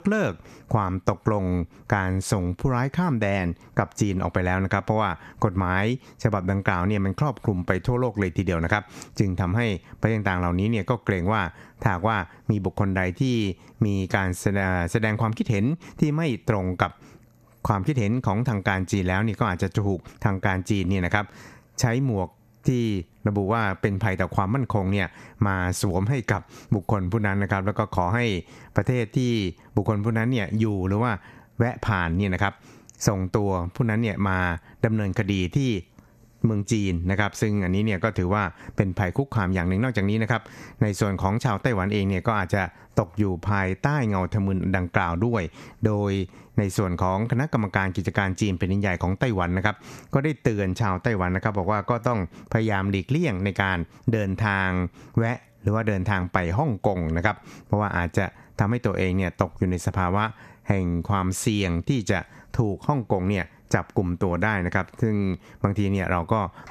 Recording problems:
squashed, flat; somewhat

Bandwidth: 14 kHz